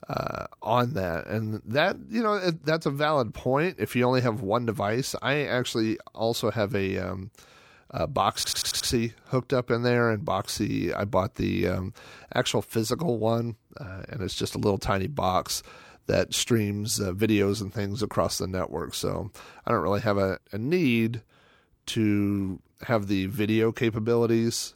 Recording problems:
audio stuttering; at 8.5 s

